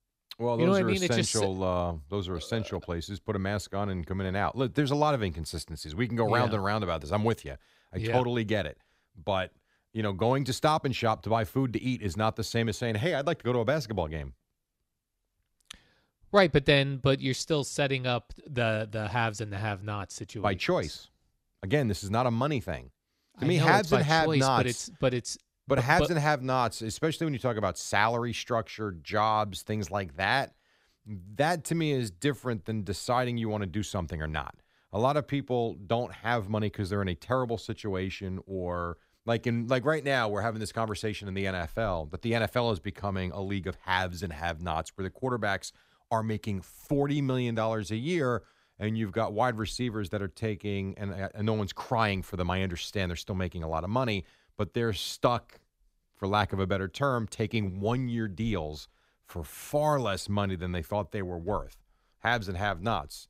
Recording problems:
none

